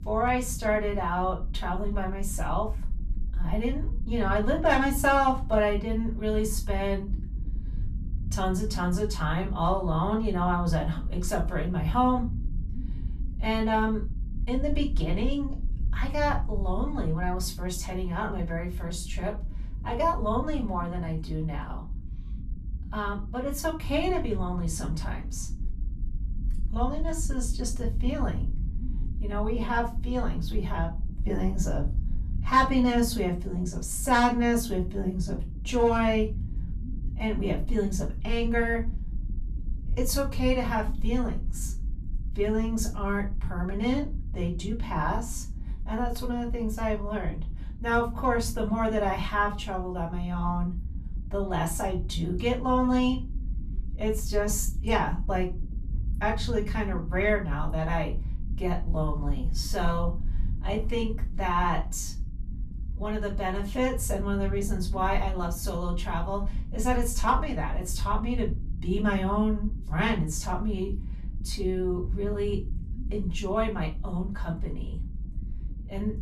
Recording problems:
off-mic speech; far
room echo; very slight; dies away in 0.3 s
low rumble; faint; throughout; 20 dB below the speech

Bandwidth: 13.5 kHz